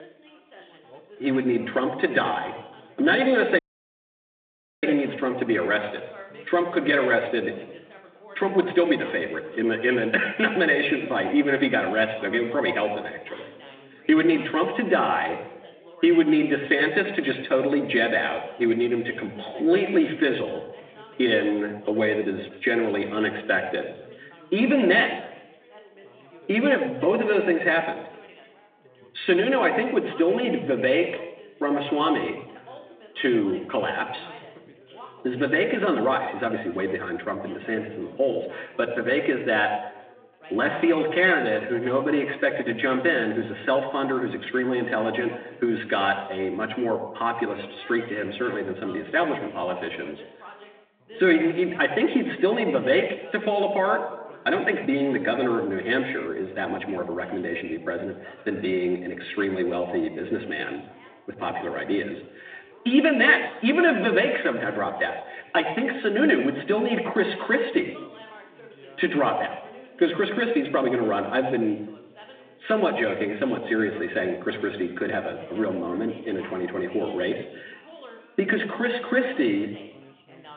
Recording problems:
off-mic speech; far
room echo; slight; dies away in 0.8 s
phone-call audio; nothing above 3.5 kHz
background chatter; faint; throughout; 4 voices, 25 dB below the speech
audio cutting out; at 3.5 s for 1 s

